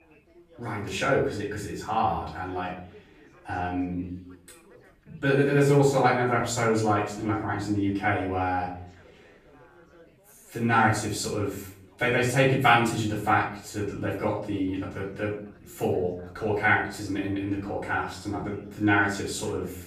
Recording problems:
off-mic speech; far
room echo; noticeable; dies away in 0.5 s
background chatter; faint; throughout; 4 voices, 30 dB below the speech

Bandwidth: 14.5 kHz